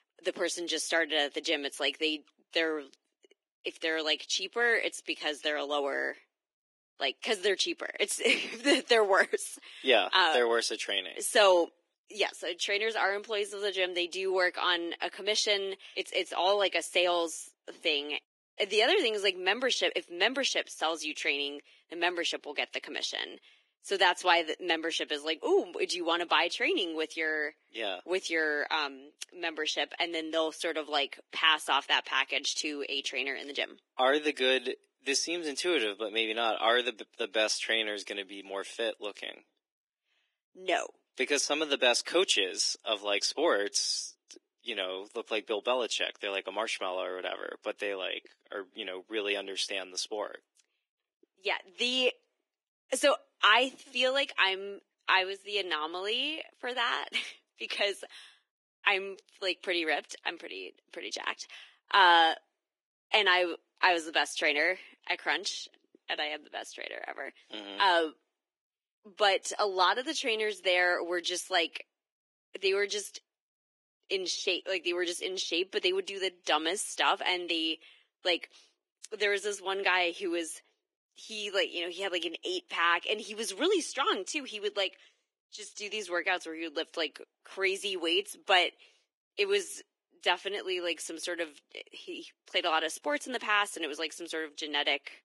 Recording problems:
garbled, watery; badly; nothing above 11.5 kHz
thin; very; fading below 300 Hz

